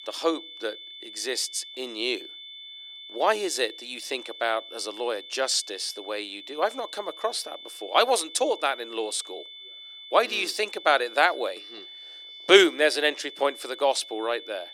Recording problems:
thin; very; fading below 300 Hz
high-pitched whine; noticeable; throughout; 3.5 kHz, 15 dB below the speech

